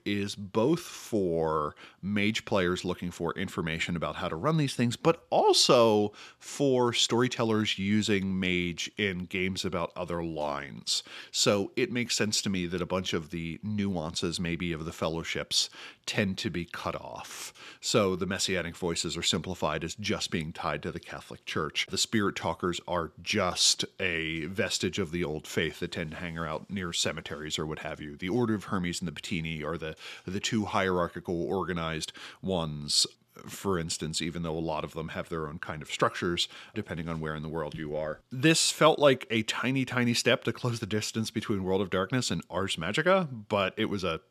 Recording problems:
none

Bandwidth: 14 kHz